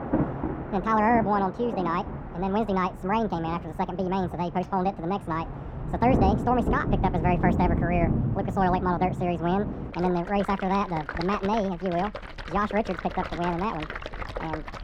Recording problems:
muffled; very; fading above 3.5 kHz
wrong speed and pitch; too fast and too high; 1.6 times normal speed
rain or running water; loud; throughout; 5 dB below the speech

